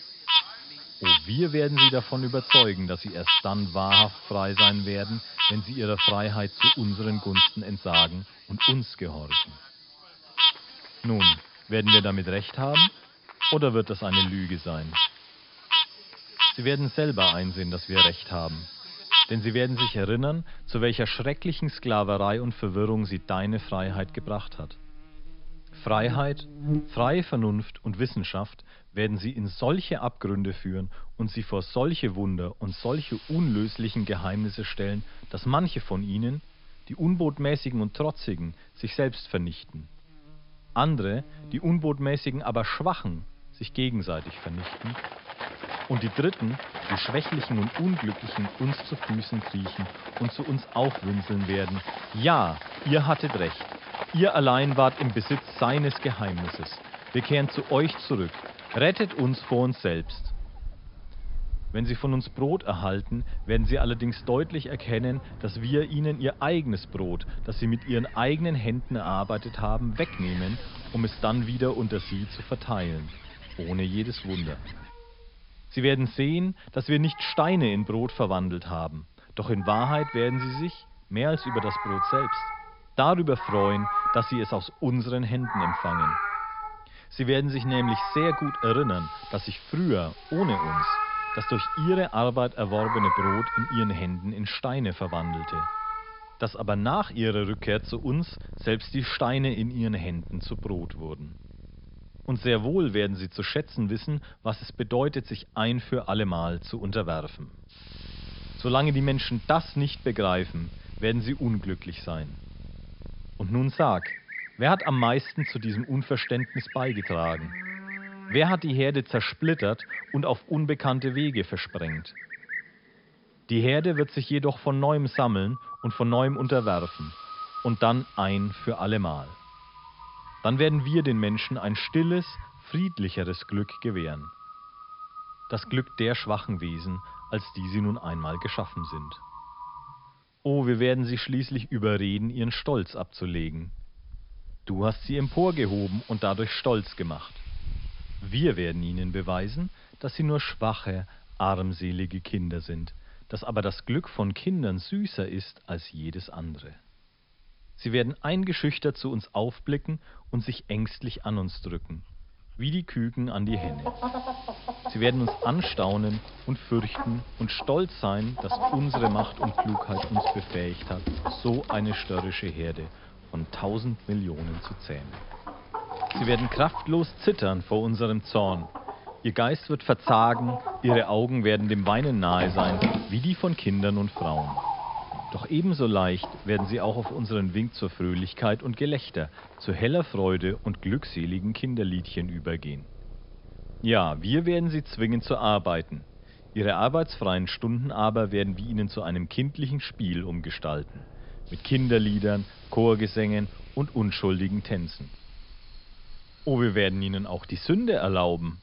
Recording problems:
high frequencies cut off; noticeable; nothing above 5.5 kHz
animal sounds; very loud; throughout; as loud as the speech
hiss; faint; throughout; 25 dB below the speech

